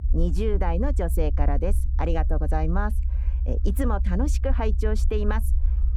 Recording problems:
muffled; slightly; fading above 2.5 kHz
low rumble; noticeable; throughout; 15 dB below the speech

